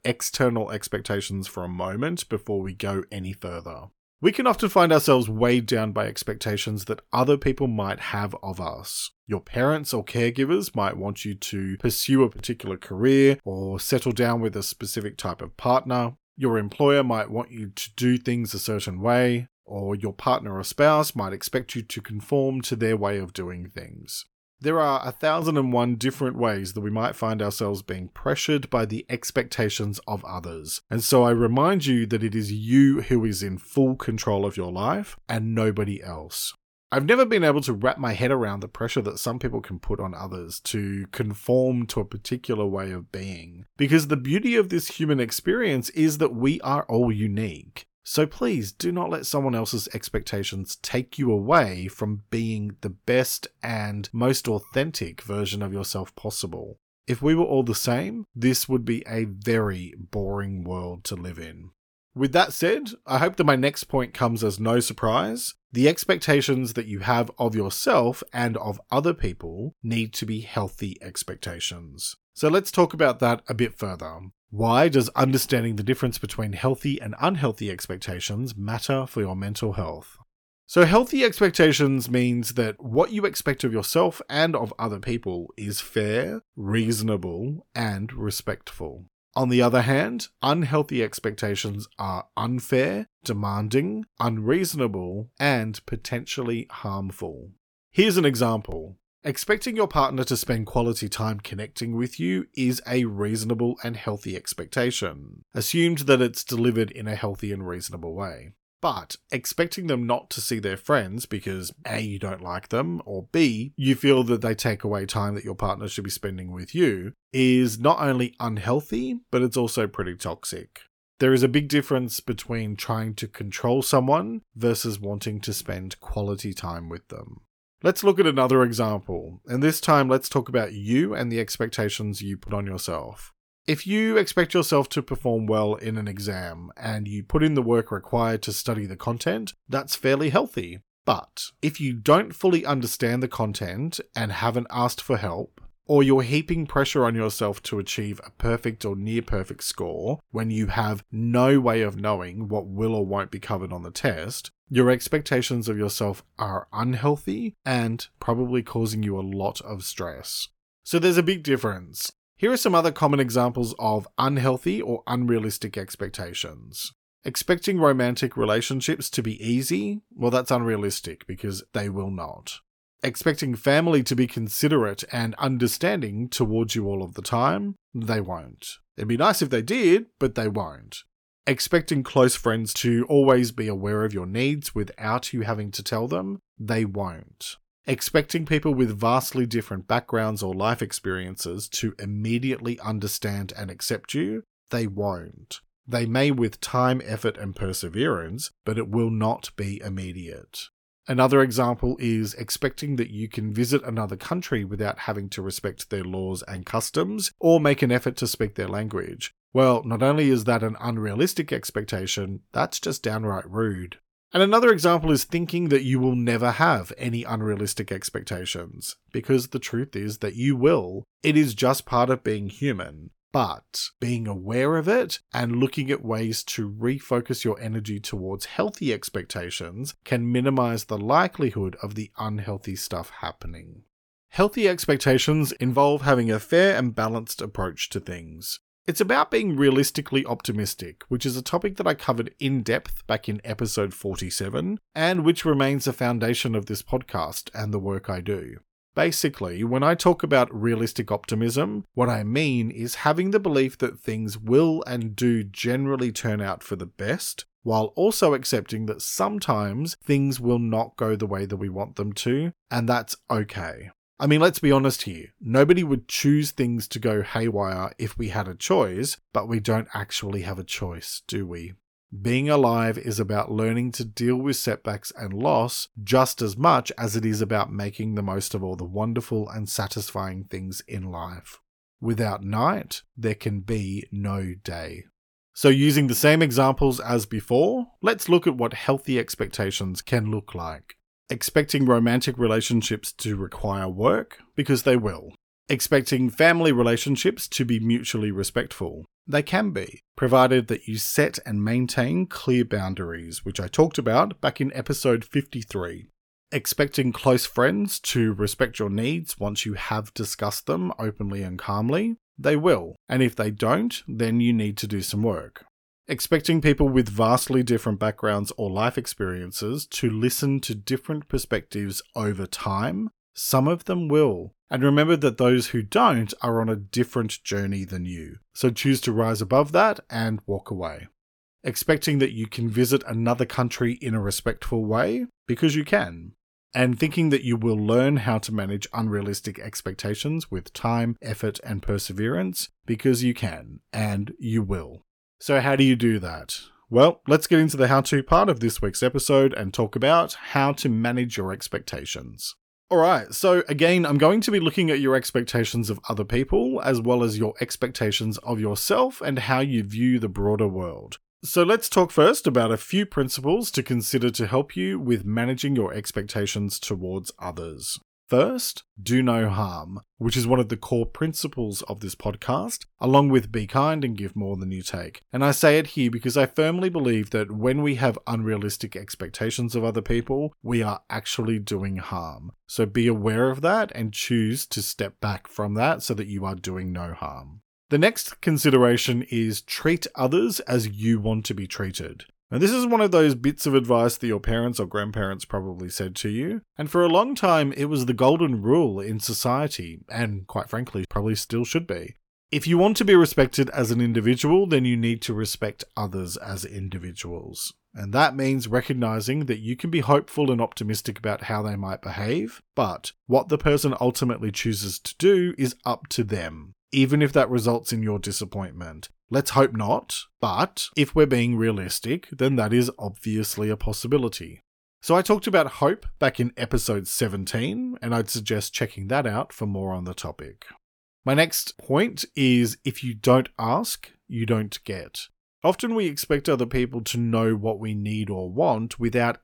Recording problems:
none

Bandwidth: 18.5 kHz